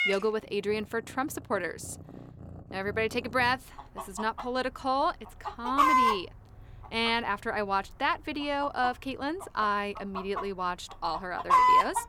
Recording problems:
animal sounds; very loud; throughout; 4 dB above the speech

